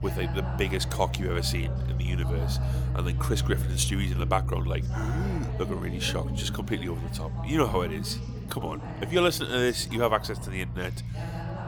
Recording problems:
background chatter; noticeable; throughout; 3 voices, 10 dB below the speech
low rumble; noticeable; throughout; 15 dB below the speech

